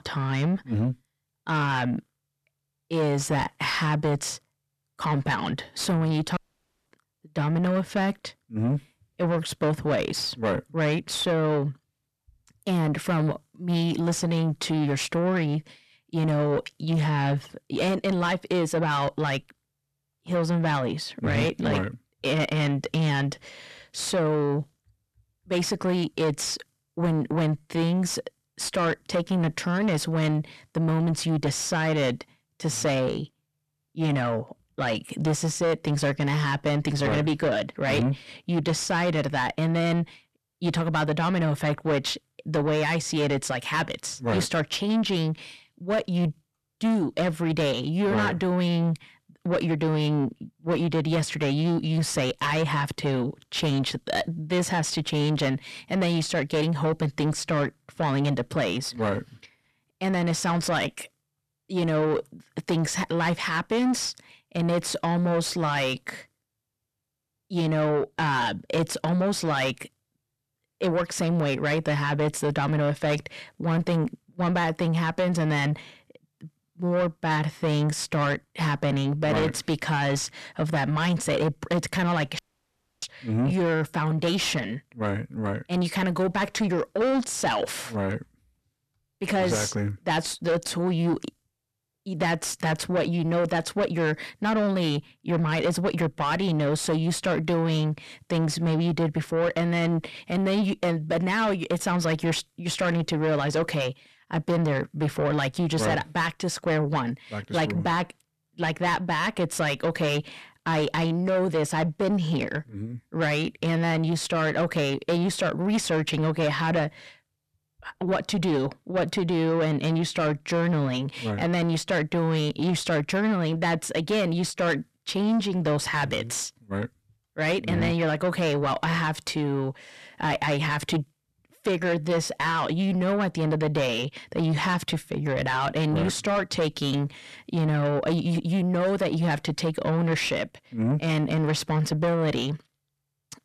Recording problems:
distortion; heavy; 7 dB below the speech
audio cutting out; at 6.5 s for 0.5 s and at 1:22 for 0.5 s

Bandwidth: 13.5 kHz